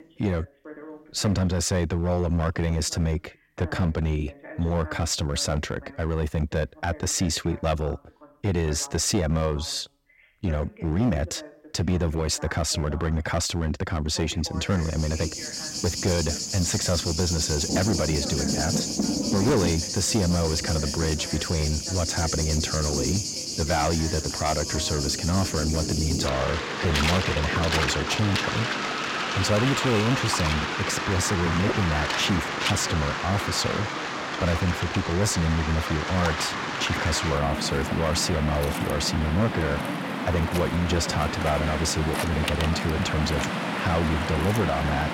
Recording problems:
distortion; slight; 6% of the sound clipped
rain or running water; loud; from 15 s on; 2 dB below the speech
voice in the background; noticeable; throughout; 20 dB below the speech

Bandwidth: 16 kHz